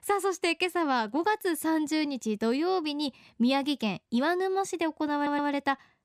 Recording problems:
audio stuttering; at 5 s

